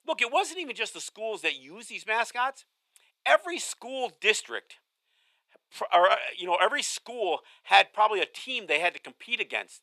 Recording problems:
thin; very; fading below 700 Hz

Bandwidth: 14 kHz